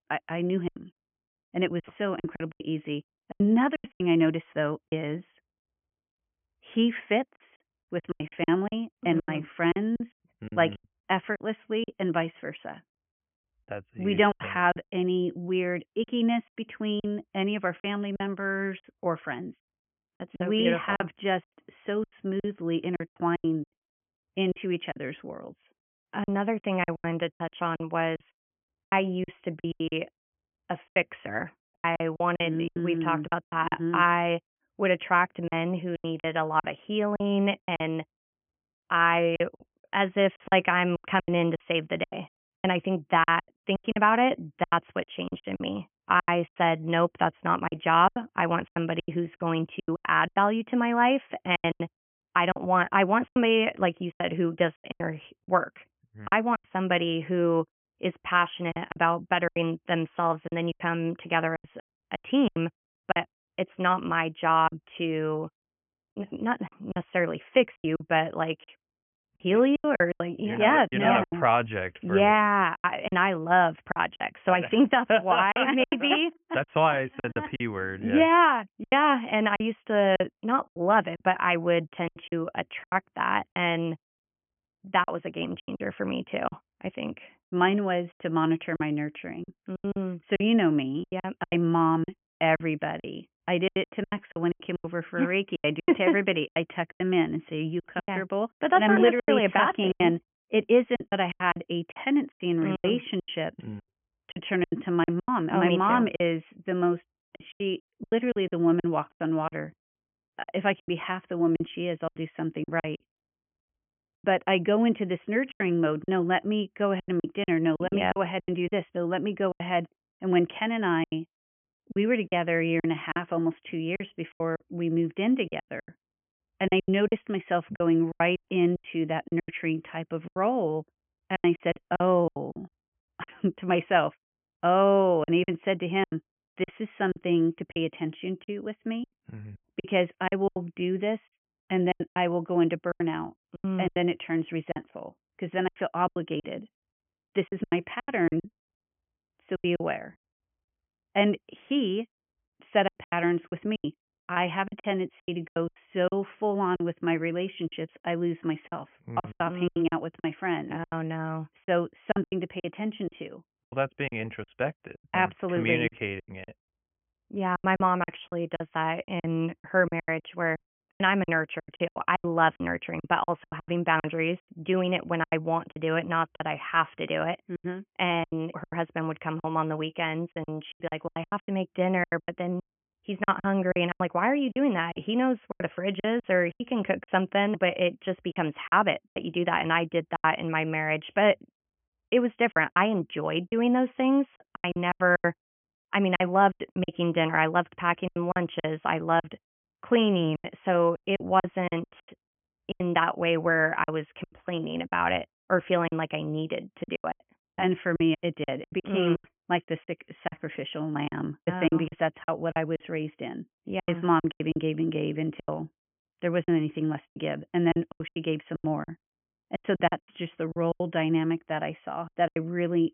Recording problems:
high frequencies cut off; severe; nothing above 3.5 kHz
choppy; very; 13% of the speech affected

